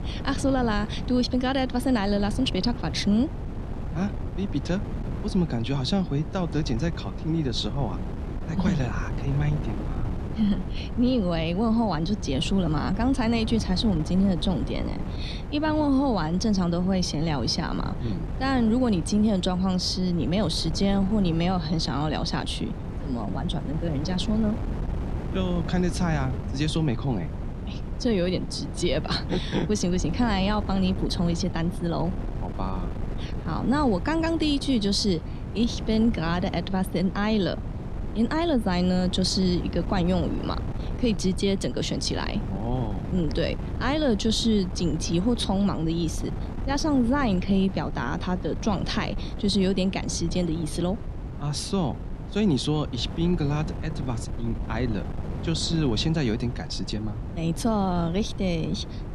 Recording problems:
wind noise on the microphone; occasional gusts; 10 dB below the speech

